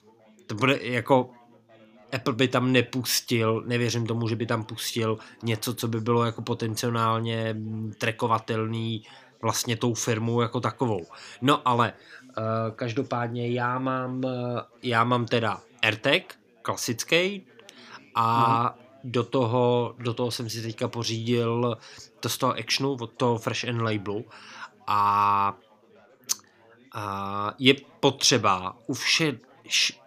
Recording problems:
background chatter; faint; throughout; 4 voices, 30 dB below the speech

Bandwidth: 15 kHz